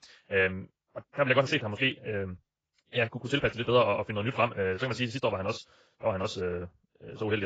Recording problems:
garbled, watery; badly; nothing above 7.5 kHz
wrong speed, natural pitch; too fast; 1.6 times normal speed
abrupt cut into speech; at the end

